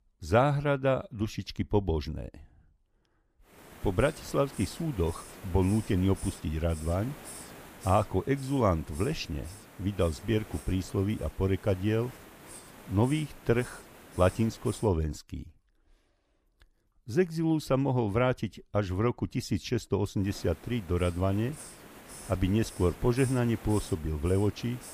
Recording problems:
hiss; noticeable; from 3.5 to 15 s and from 20 s on; 15 dB below the speech

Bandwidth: 15 kHz